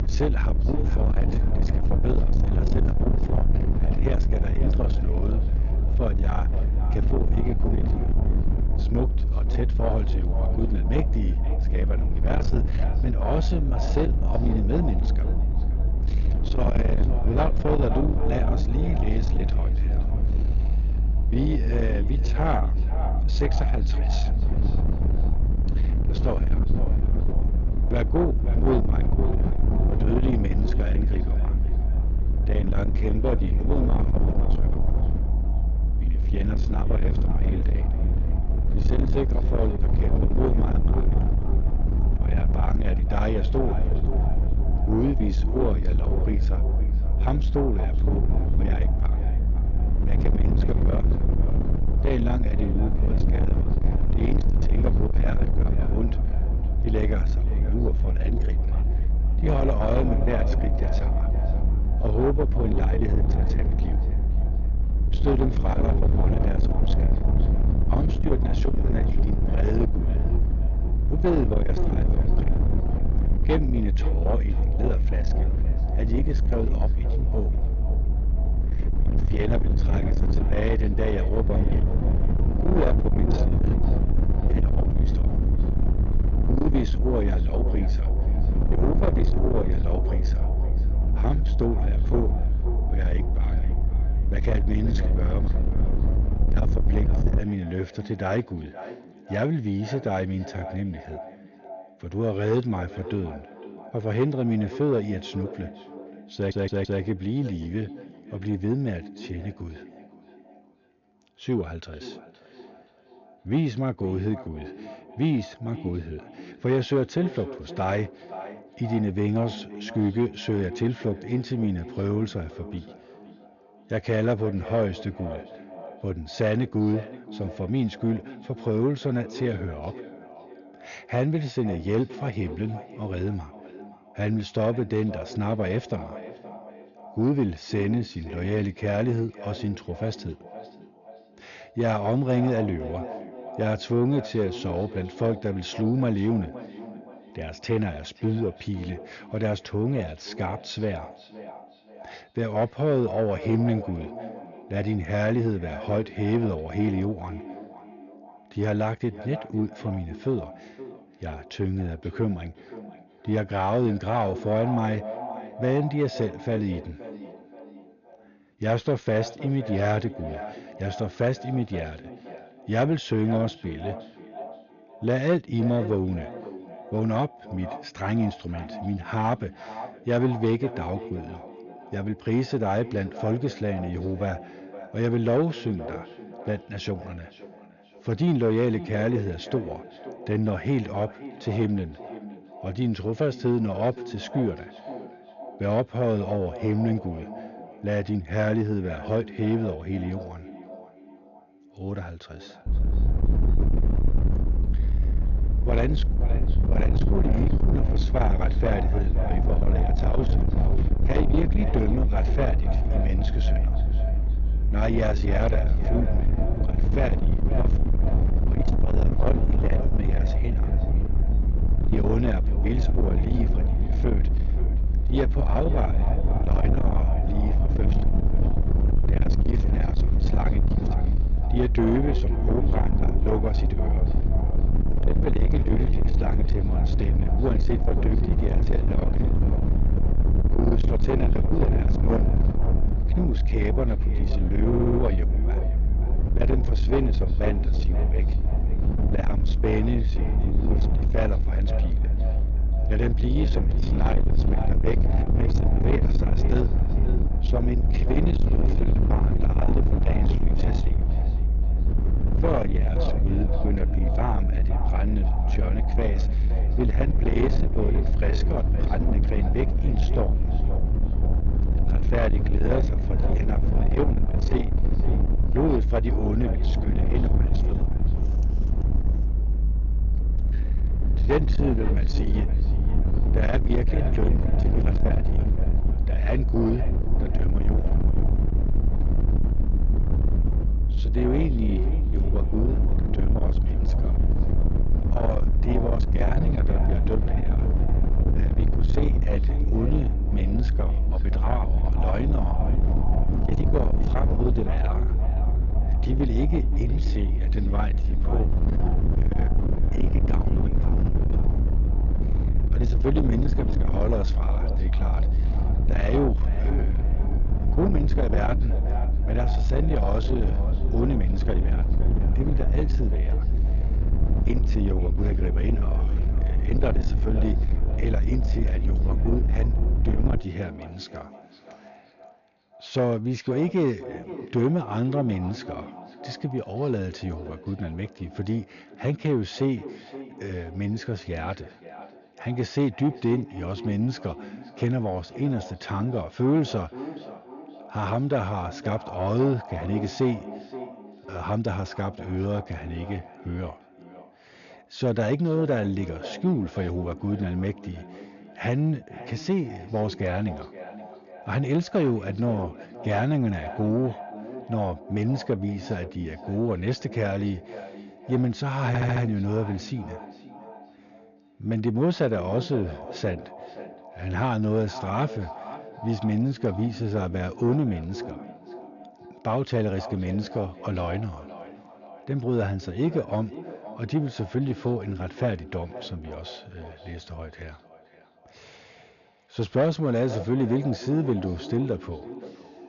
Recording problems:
distortion; heavy; 8 dB below the speech
echo of what is said; noticeable; throughout; 520 ms later, 15 dB below the speech
high frequencies cut off; noticeable; nothing above 6.5 kHz
low rumble; loud; until 1:37 and from 3:23 to 5:30; 6 dB below the speech
audio stuttering; at 1:46, at 4:05 and at 6:09

